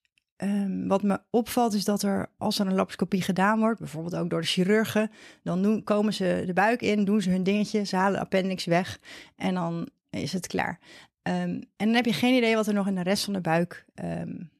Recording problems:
none

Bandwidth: 13.5 kHz